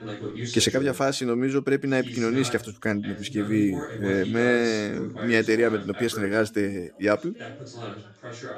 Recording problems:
background chatter; noticeable; throughout; 2 voices, 10 dB below the speech

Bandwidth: 14.5 kHz